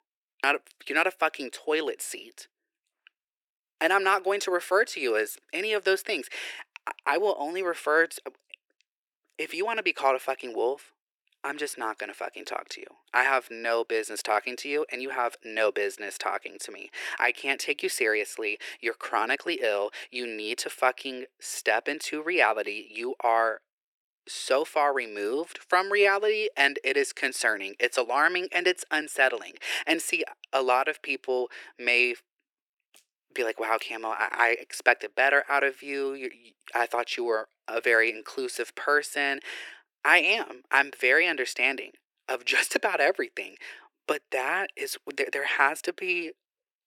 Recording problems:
thin; very; fading below 350 Hz

